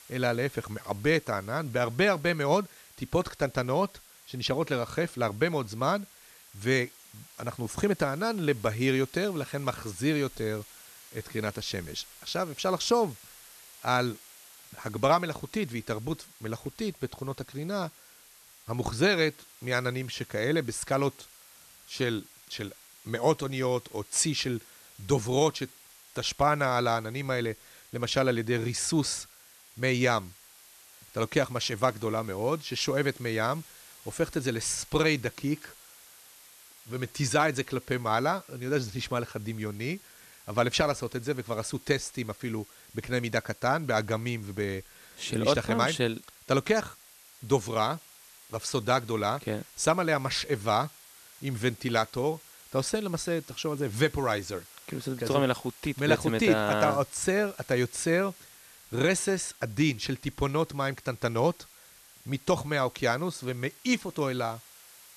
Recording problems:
hiss; faint; throughout; 20 dB below the speech

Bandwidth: 13.5 kHz